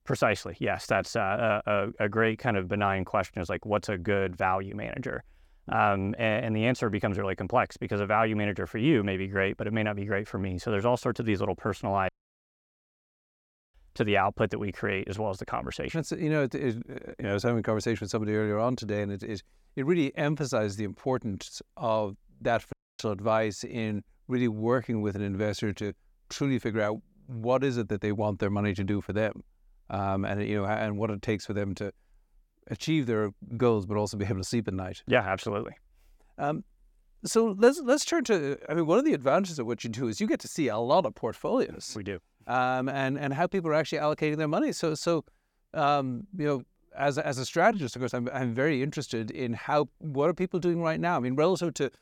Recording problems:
audio cutting out; at 12 s for 1.5 s and at 23 s

